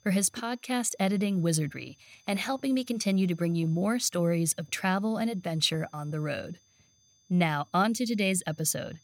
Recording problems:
high-pitched whine; faint; throughout; 6 kHz, 35 dB below the speech

